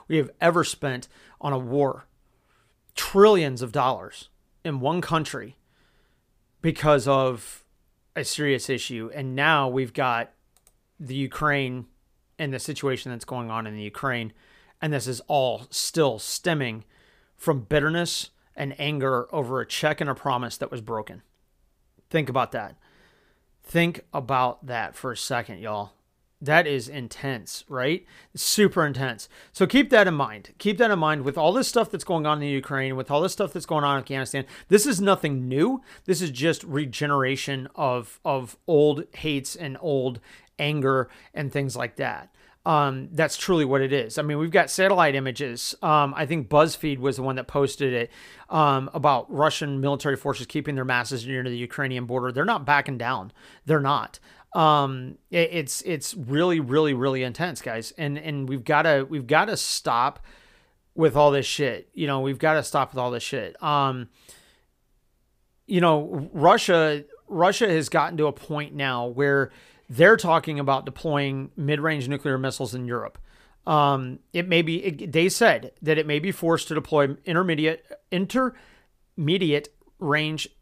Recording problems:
none

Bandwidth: 15 kHz